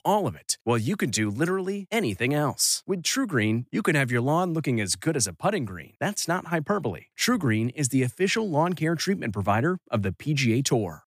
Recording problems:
none

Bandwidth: 15 kHz